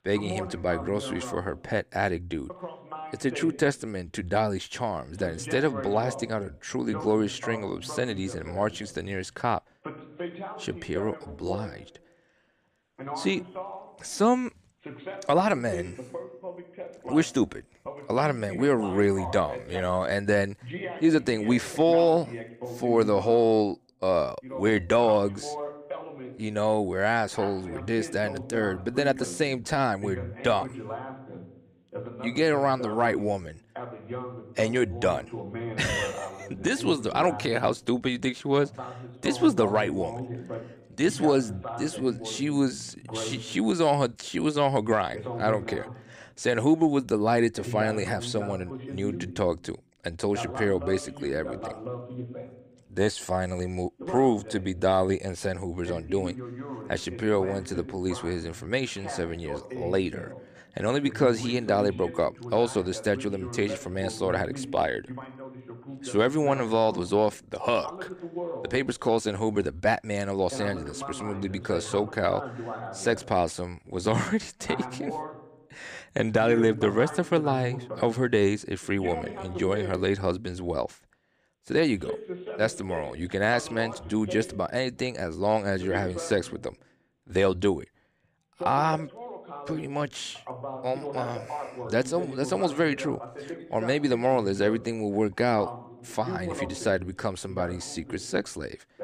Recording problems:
voice in the background; noticeable; throughout; 10 dB below the speech

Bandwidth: 14.5 kHz